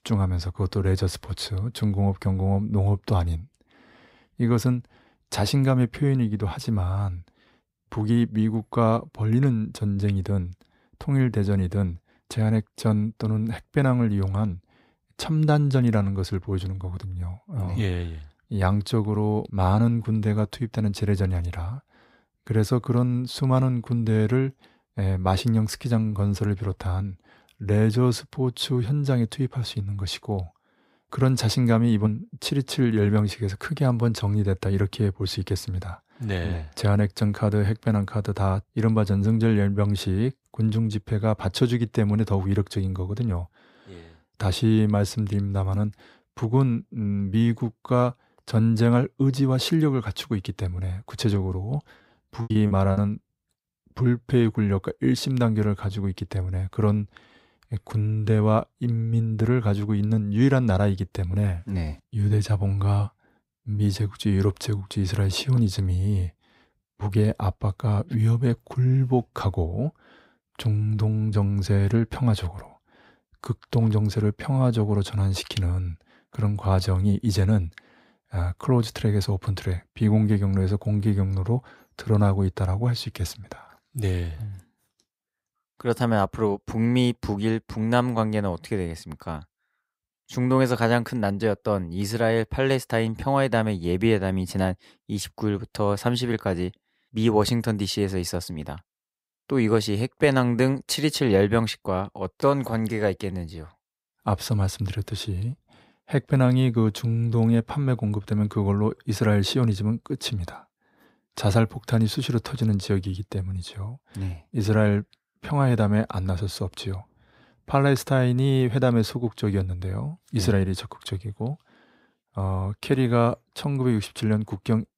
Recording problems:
choppy; very; at 52 s; 24% of the speech affected

